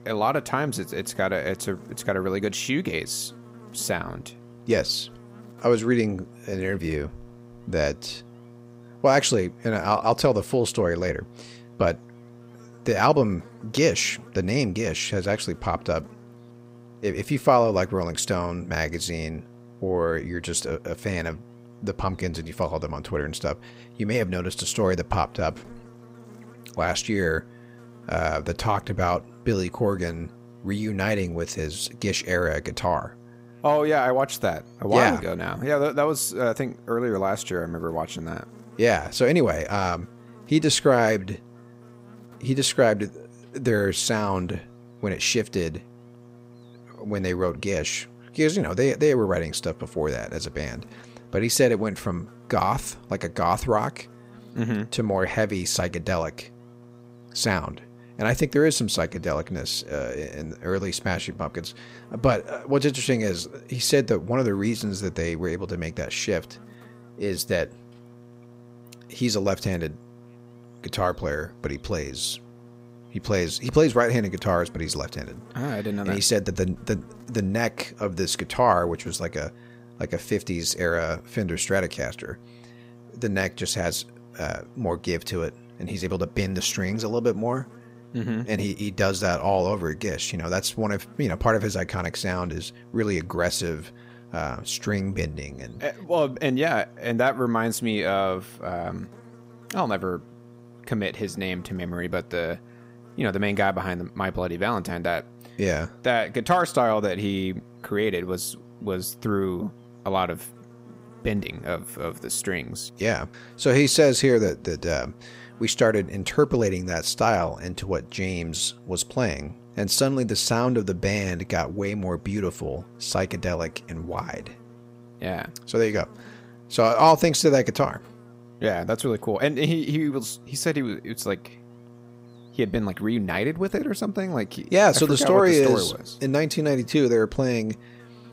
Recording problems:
electrical hum; faint; throughout; 60 Hz, 25 dB below the speech

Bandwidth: 15.5 kHz